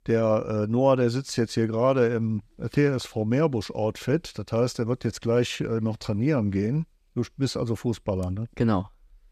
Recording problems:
none

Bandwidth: 14.5 kHz